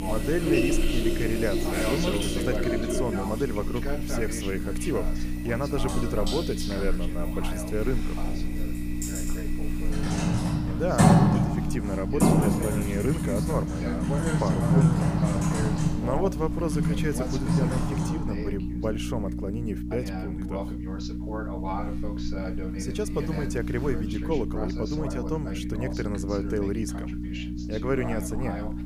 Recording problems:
household noises; very loud; until 18 s; 4 dB above the speech
electrical hum; loud; throughout; 60 Hz, 6 dB below the speech
voice in the background; loud; throughout; 7 dB below the speech

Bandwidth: 15 kHz